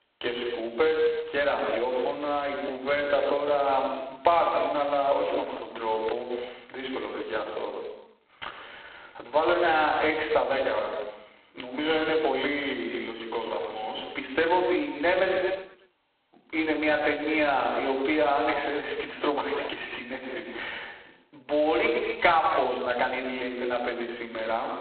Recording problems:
phone-call audio; poor line; nothing above 4 kHz
room echo; noticeable; dies away in 0.9 s
off-mic speech; somewhat distant
squashed, flat; somewhat

